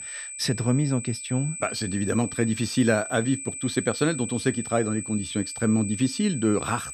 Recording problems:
high-pitched whine; loud; throughout; 8 kHz, 8 dB below the speech

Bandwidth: 14.5 kHz